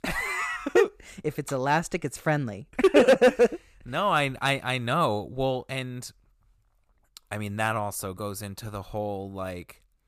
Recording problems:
none

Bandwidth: 14.5 kHz